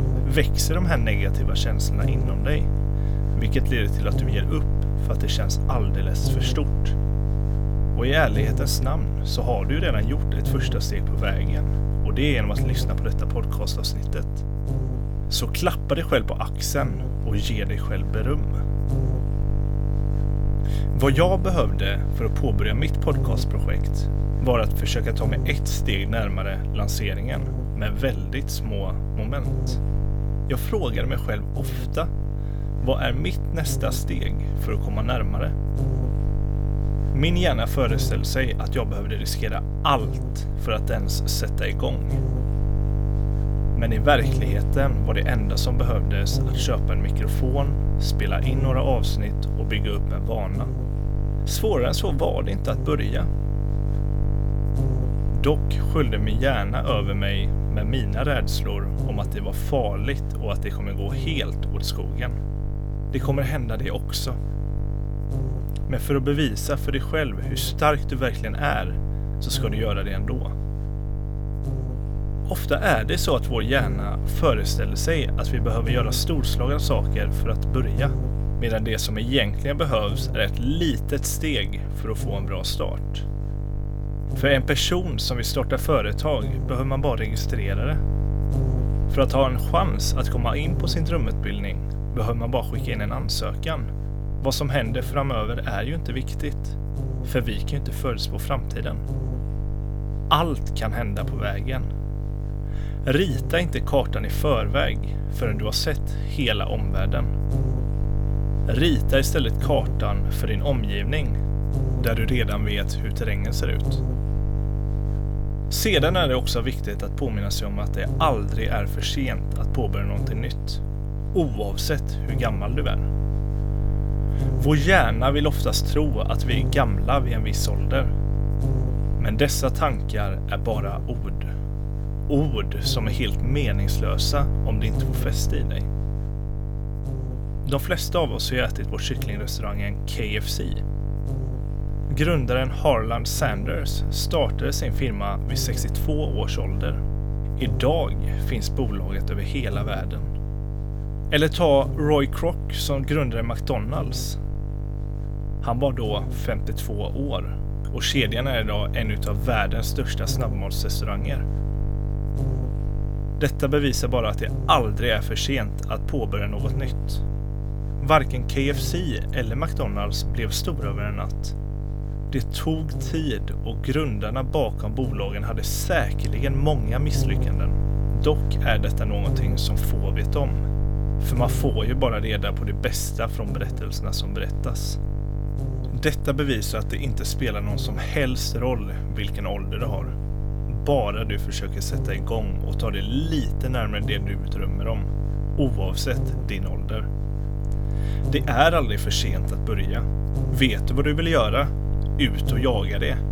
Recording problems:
electrical hum; noticeable; throughout; 50 Hz, 10 dB below the speech

